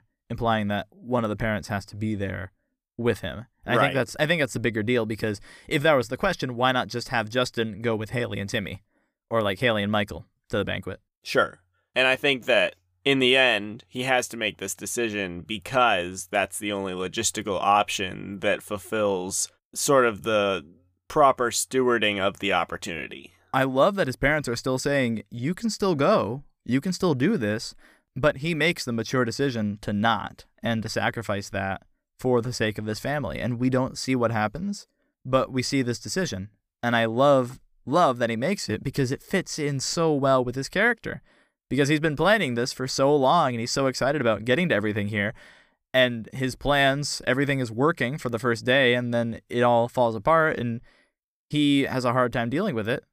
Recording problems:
none

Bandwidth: 15 kHz